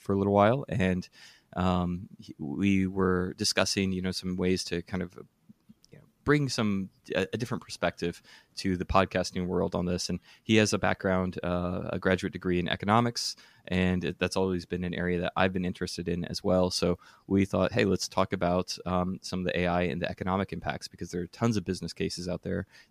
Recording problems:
none

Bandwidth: 15 kHz